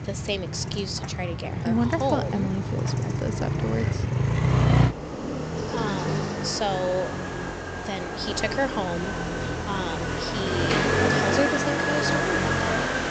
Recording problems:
high frequencies cut off; noticeable; nothing above 8 kHz
traffic noise; very loud; throughout; 3 dB above the speech
train or aircraft noise; faint; throughout; 25 dB below the speech

